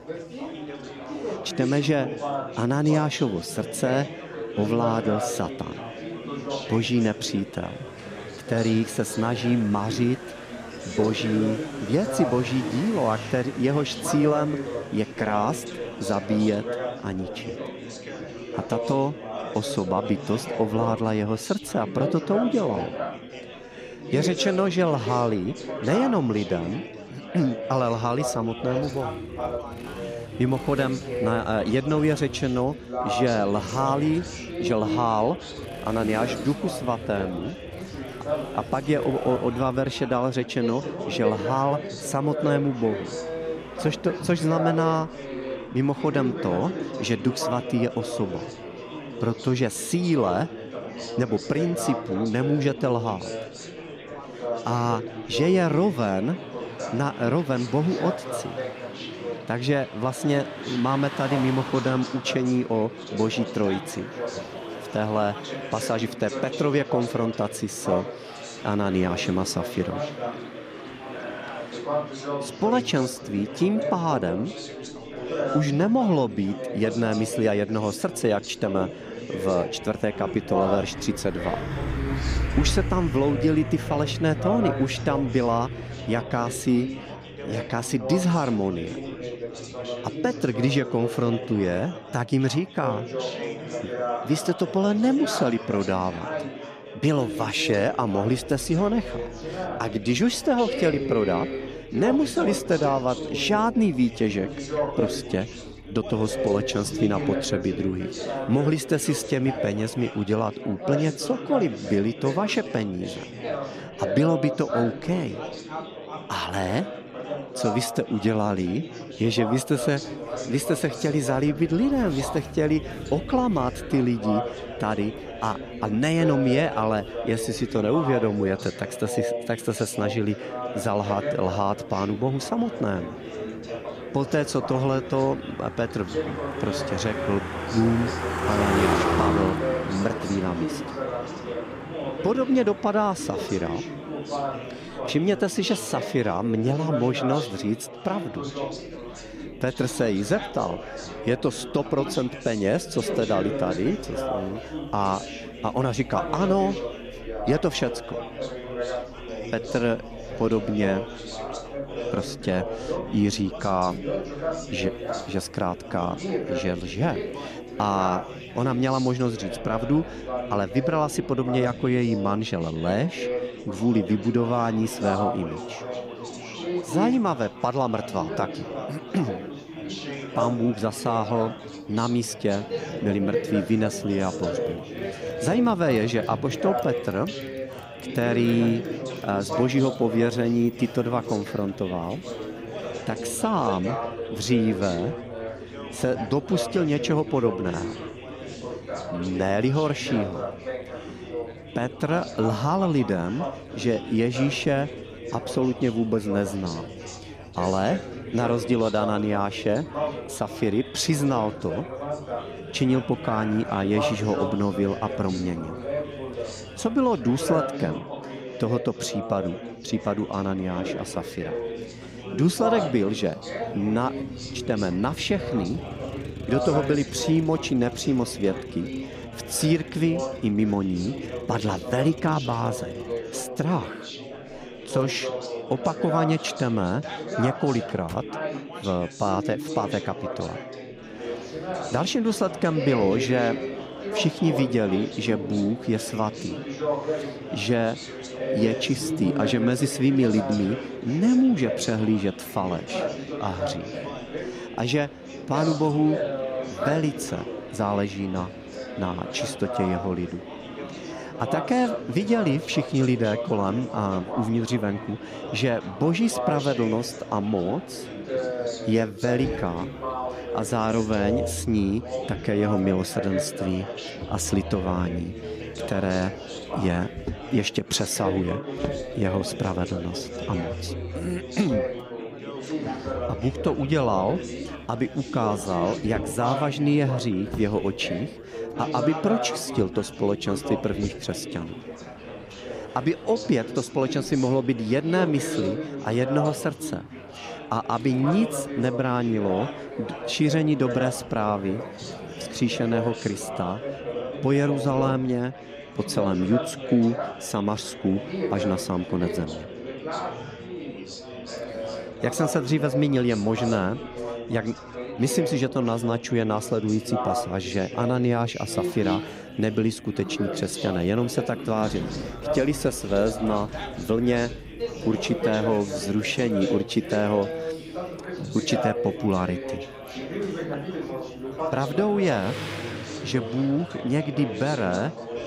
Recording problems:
chatter from many people; loud; throughout; 7 dB below the speech
traffic noise; noticeable; throughout; 15 dB below the speech

